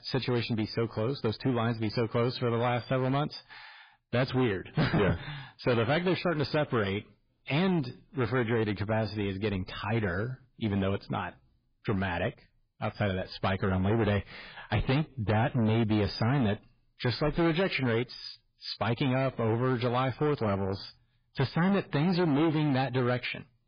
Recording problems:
distortion; heavy; 13% of the sound clipped
garbled, watery; badly; nothing above 5 kHz

